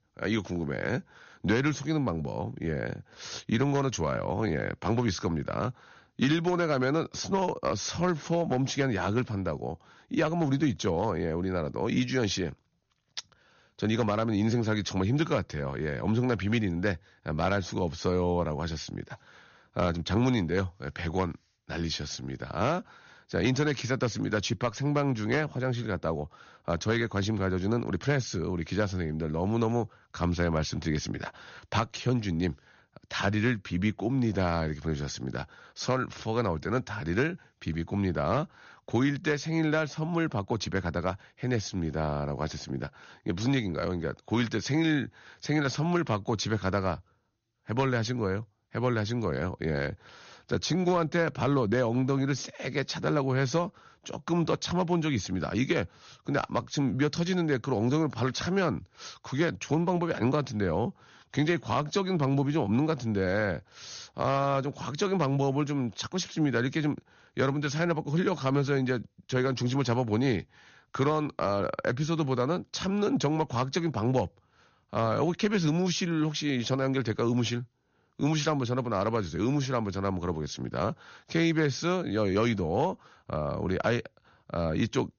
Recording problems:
high frequencies cut off; noticeable; nothing above 6.5 kHz

